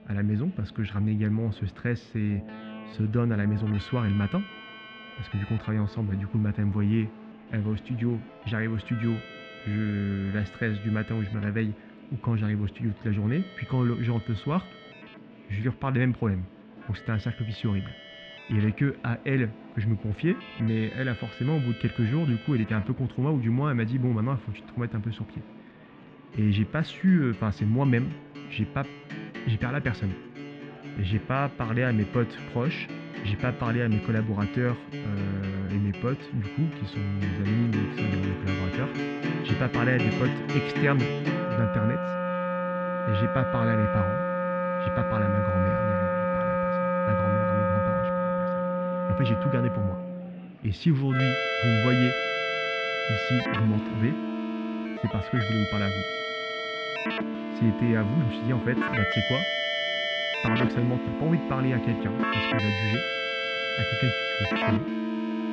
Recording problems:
muffled; very; fading above 3 kHz
background music; loud; throughout; 1 dB below the speech
murmuring crowd; faint; throughout; 25 dB below the speech

